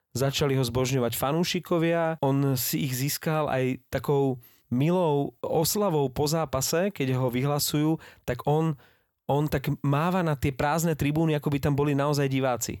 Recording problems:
none

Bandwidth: 18 kHz